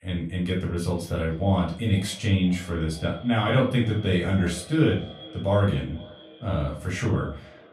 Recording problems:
off-mic speech; far
echo of what is said; faint; throughout; 480 ms later, 20 dB below the speech
room echo; slight; dies away in 0.3 s

